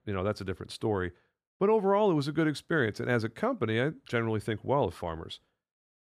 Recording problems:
none

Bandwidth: 14.5 kHz